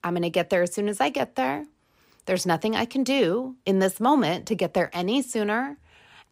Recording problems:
none

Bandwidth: 15.5 kHz